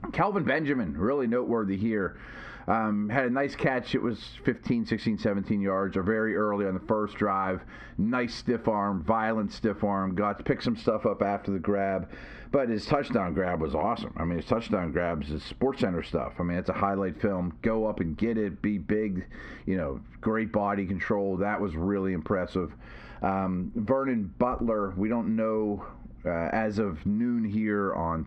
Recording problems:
squashed, flat; heavily
muffled; very slightly; fading above 1.5 kHz

